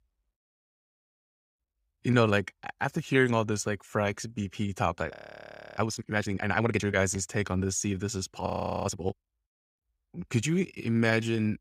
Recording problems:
audio freezing; at 5 s for 0.5 s and at 8.5 s

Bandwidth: 15.5 kHz